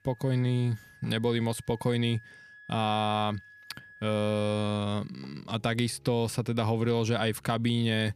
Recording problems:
background music; faint; throughout; 25 dB below the speech

